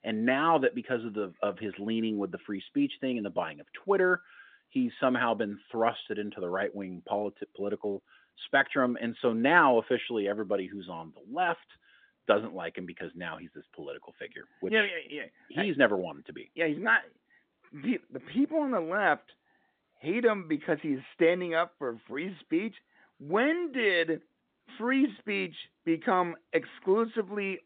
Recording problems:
phone-call audio; nothing above 3.5 kHz

